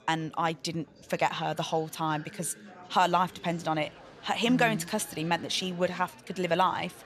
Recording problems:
chatter from many people; faint; throughout; 20 dB below the speech

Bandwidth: 13.5 kHz